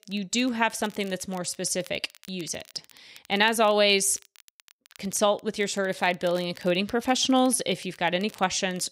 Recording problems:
crackle, like an old record; faint; 25 dB below the speech

